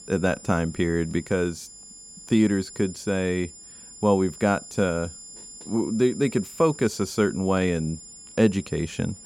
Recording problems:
high-pitched whine; noticeable; throughout; 7 kHz, 15 dB below the speech

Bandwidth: 16.5 kHz